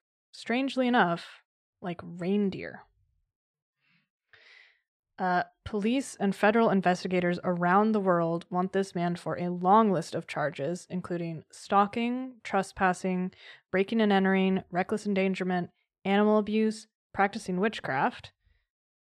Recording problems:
none

